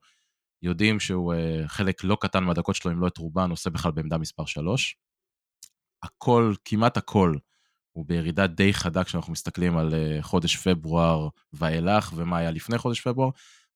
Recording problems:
none

